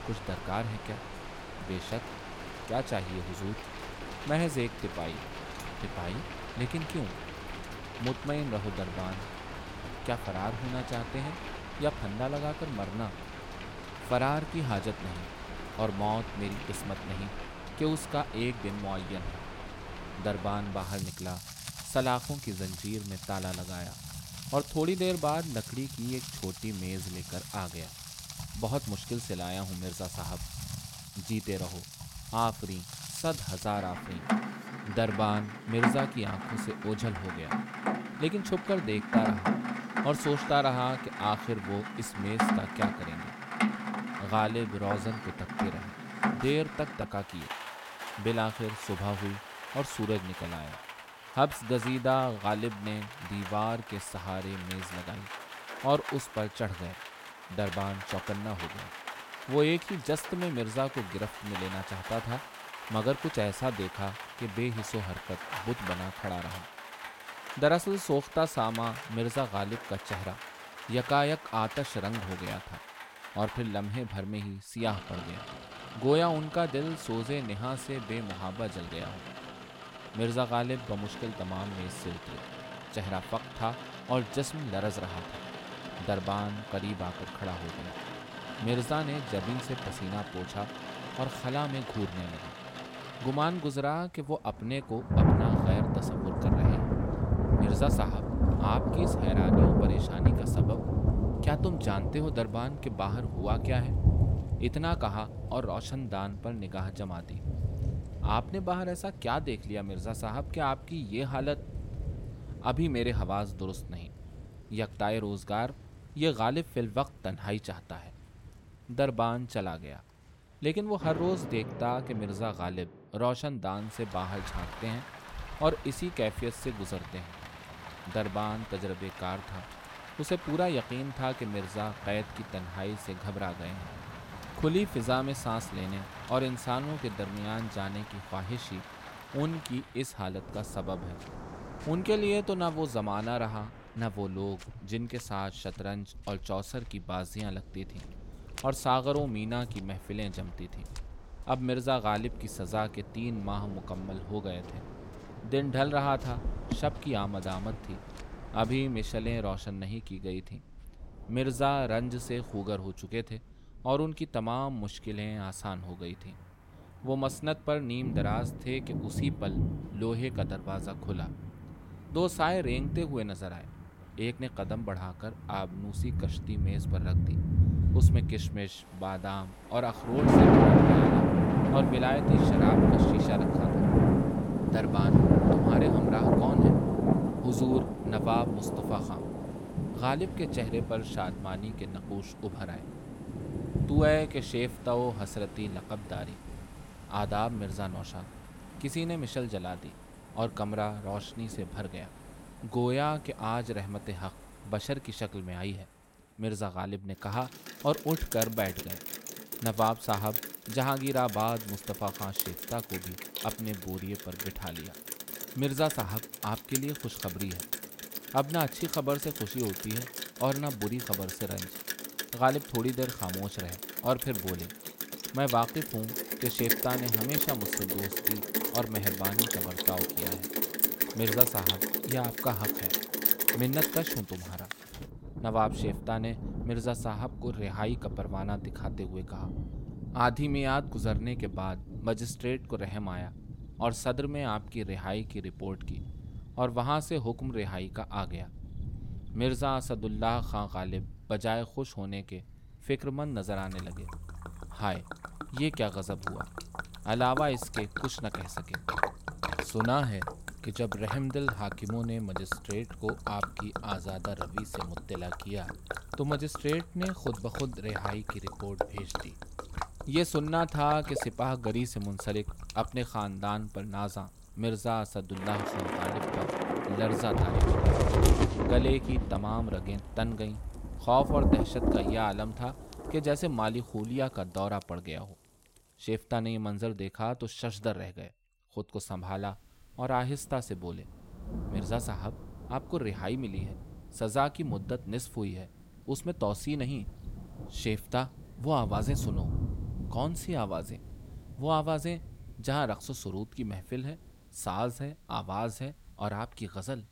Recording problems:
rain or running water; very loud; throughout; as loud as the speech

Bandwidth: 16.5 kHz